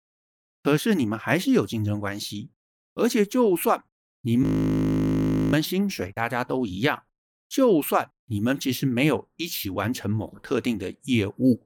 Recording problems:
audio freezing; at 4.5 s for 1 s

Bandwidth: 18 kHz